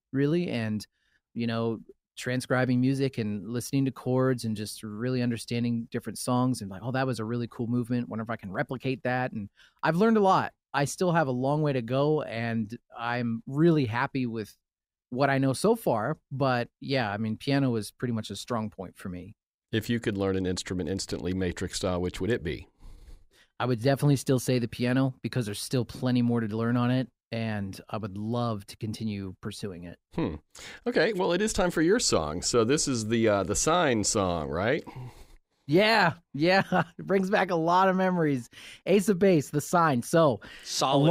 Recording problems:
abrupt cut into speech; at the end

